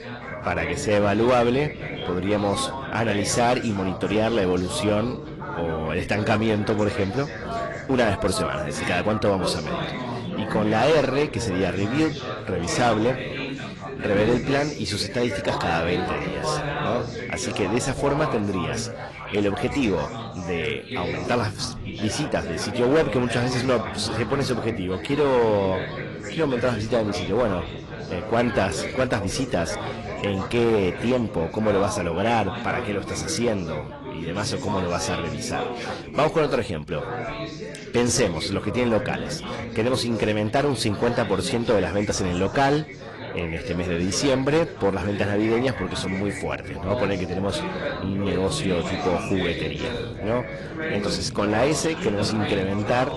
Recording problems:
distortion; slight; 6% of the sound clipped
garbled, watery; slightly; nothing above 11 kHz
background chatter; loud; throughout; 4 voices, 7 dB below the speech

